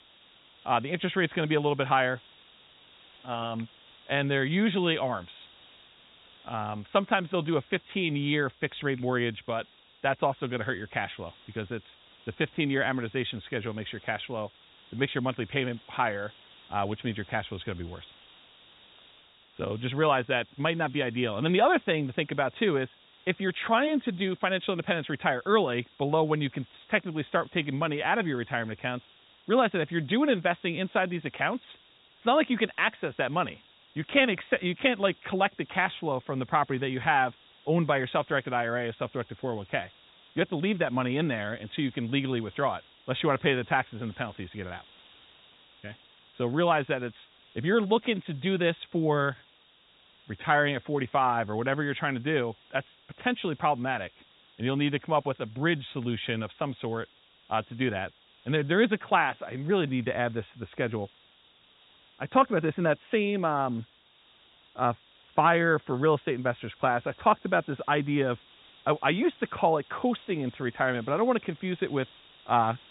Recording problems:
high frequencies cut off; severe; nothing above 4 kHz
hiss; faint; throughout; 25 dB below the speech

